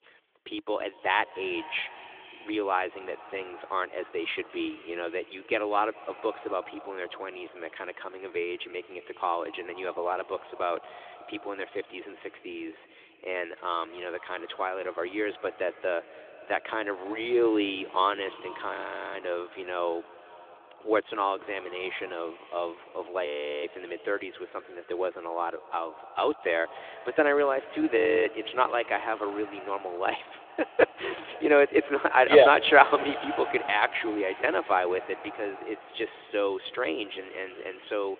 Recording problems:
echo of what is said; noticeable; throughout; 220 ms later, 15 dB below the speech
phone-call audio; nothing above 3.5 kHz
audio freezing; at 19 s, at 23 s and at 28 s

